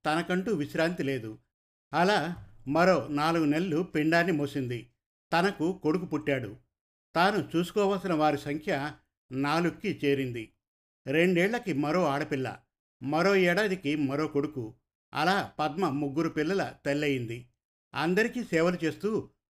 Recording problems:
none

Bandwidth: 15 kHz